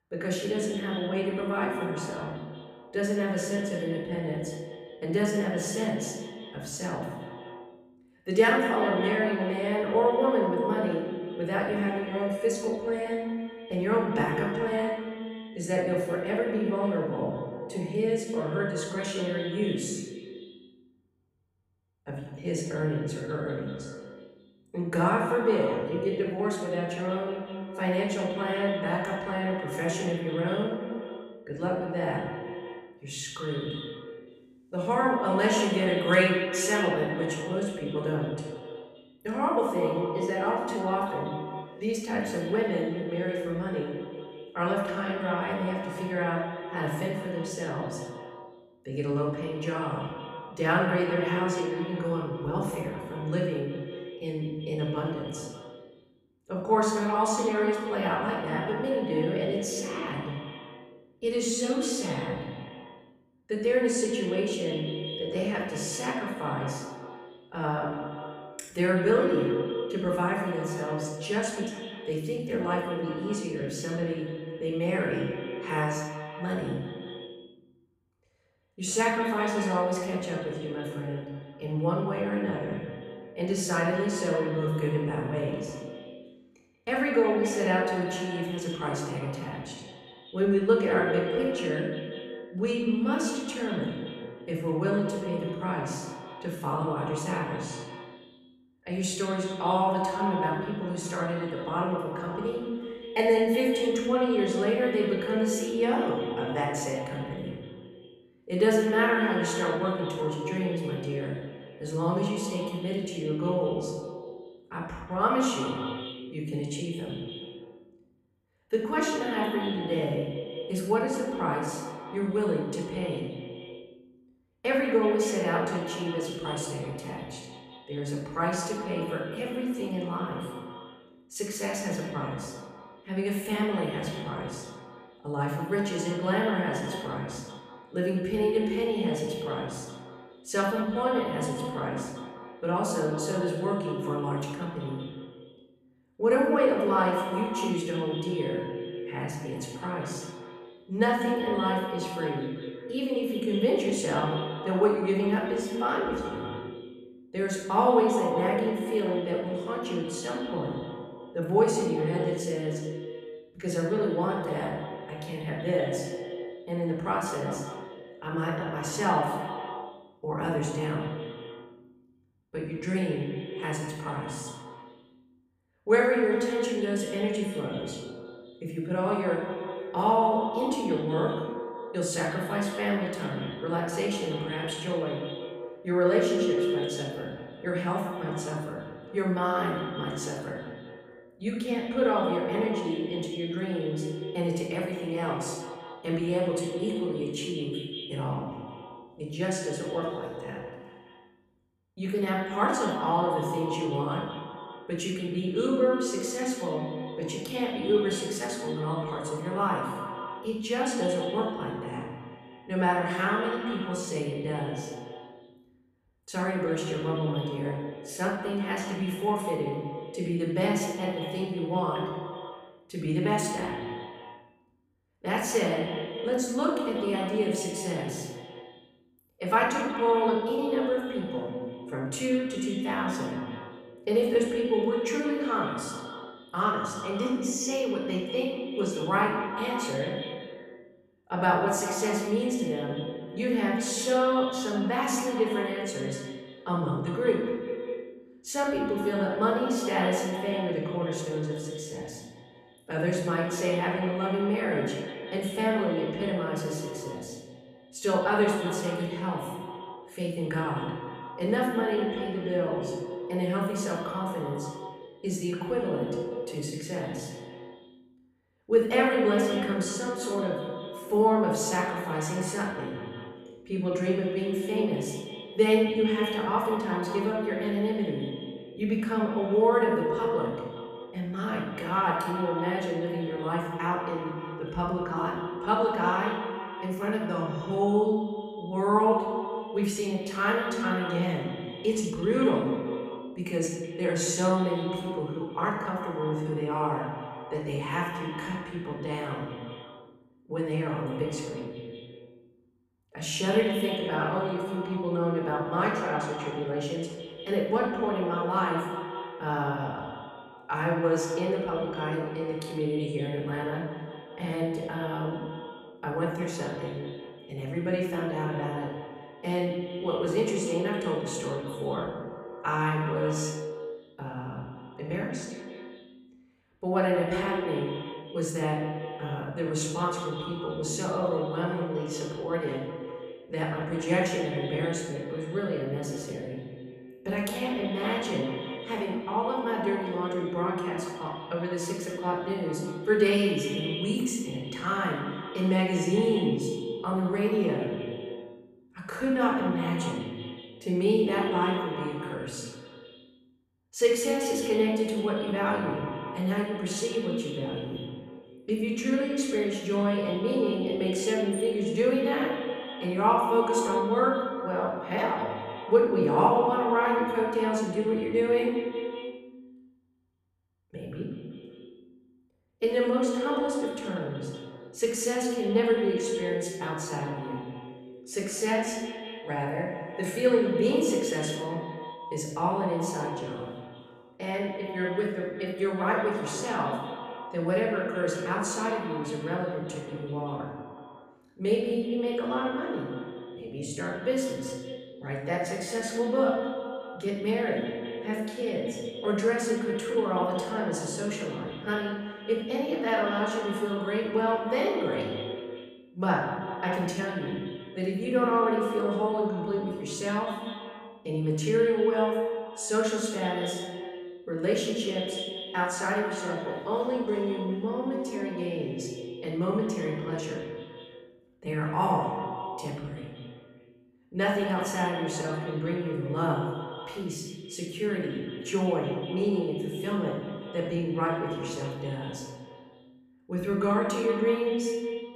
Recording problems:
echo of what is said; strong; throughout; 190 ms later, 7 dB below the speech
off-mic speech; far
room echo; noticeable; dies away in 0.8 s

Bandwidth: 15 kHz